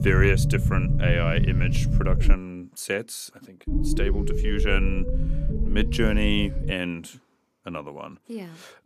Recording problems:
low rumble; loud; until 2.5 s and from 3.5 to 6.5 s; 7 dB below the speech

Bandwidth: 14.5 kHz